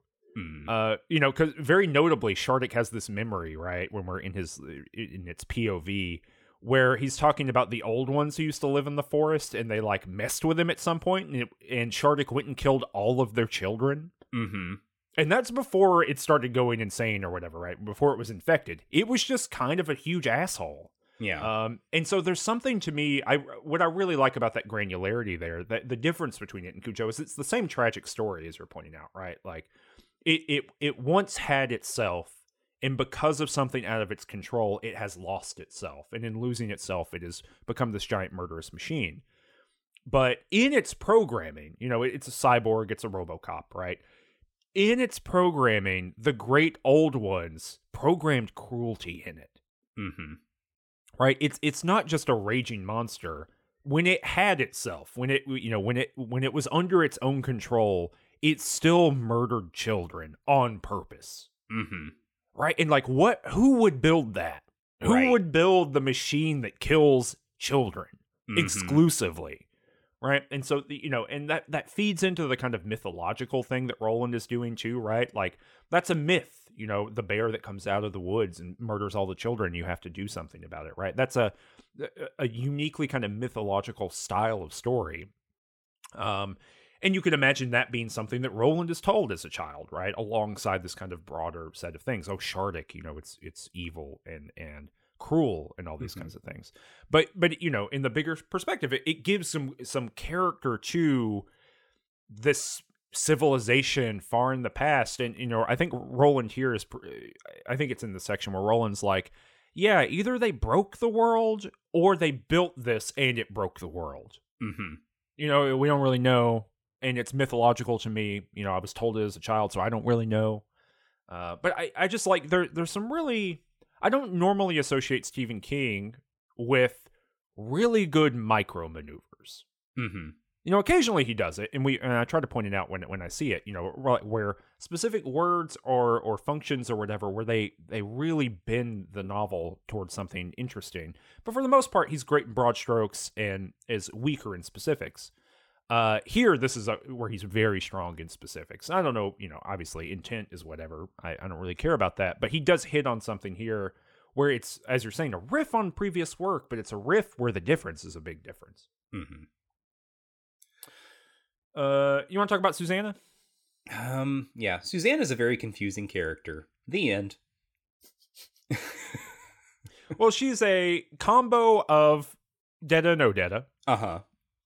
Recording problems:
none

